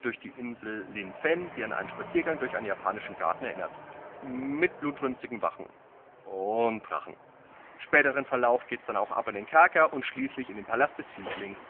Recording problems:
phone-call audio; poor line
traffic noise; noticeable; throughout; 20 dB below the speech

